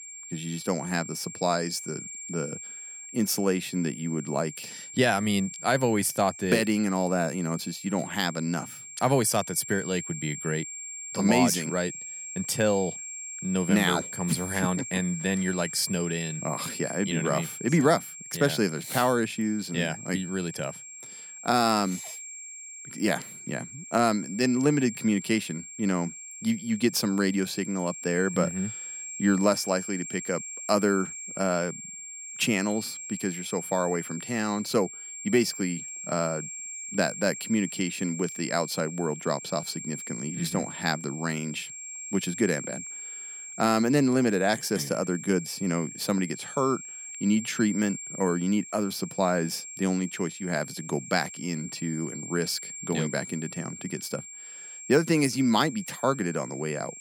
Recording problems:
high-pitched whine; loud; throughout; 7.5 kHz, 10 dB below the speech

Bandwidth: 17.5 kHz